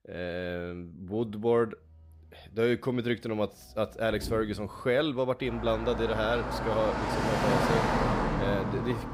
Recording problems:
traffic noise; loud; throughout; as loud as the speech

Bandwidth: 15.5 kHz